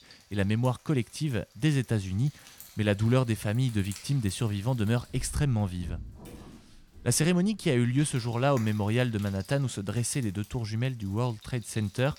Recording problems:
household noises; faint; throughout; 20 dB below the speech

